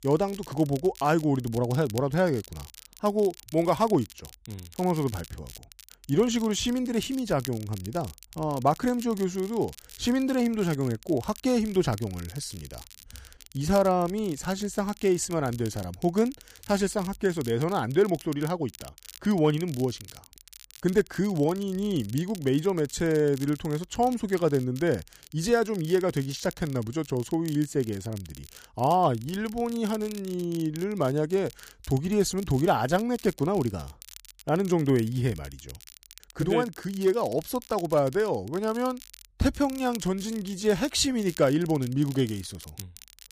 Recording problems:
crackle, like an old record; noticeable; 20 dB below the speech

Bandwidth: 15 kHz